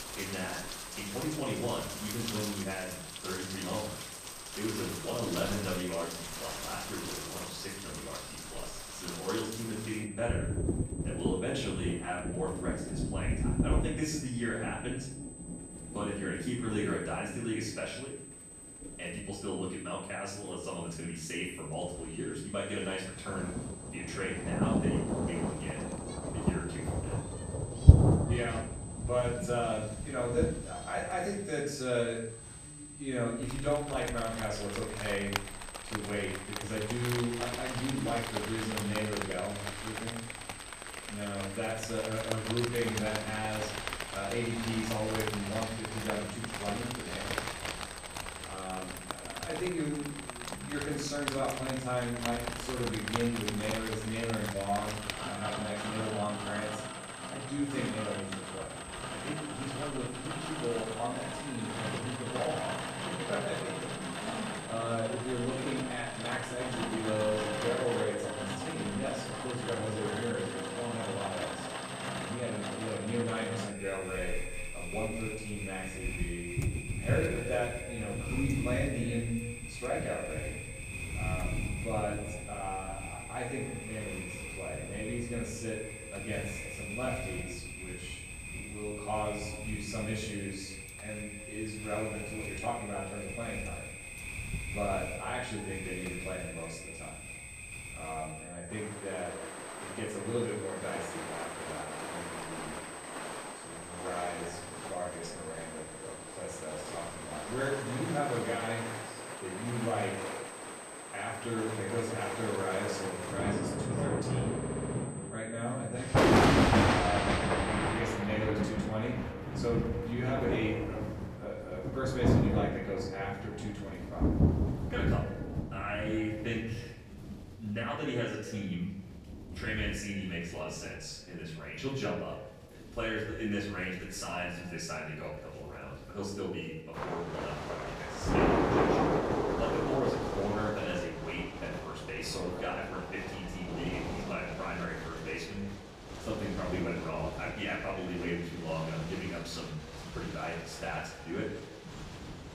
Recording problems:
off-mic speech; far
echo of what is said; noticeable; from 1:07 on; 140 ms later, 10 dB below the speech
room echo; noticeable; dies away in 0.6 s
rain or running water; very loud; throughout; as loud as the speech
high-pitched whine; noticeable; until 1:58; 8 kHz, 10 dB below the speech
audio stuttering; at 1:55

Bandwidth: 15 kHz